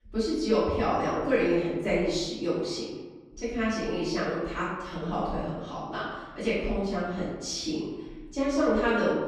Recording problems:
off-mic speech; far
room echo; noticeable; dies away in 1.1 s

